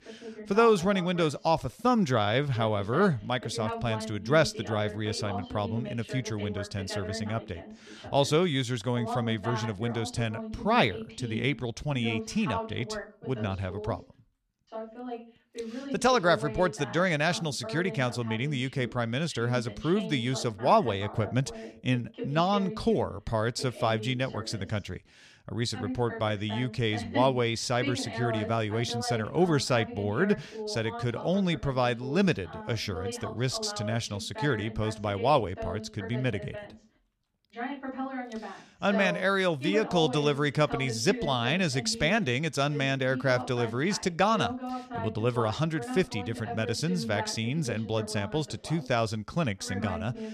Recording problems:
voice in the background; noticeable; throughout; 10 dB below the speech

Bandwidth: 14 kHz